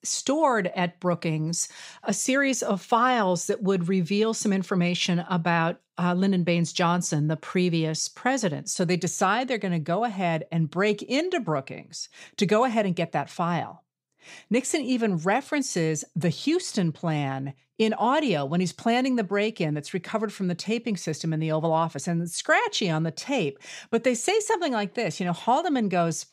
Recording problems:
none

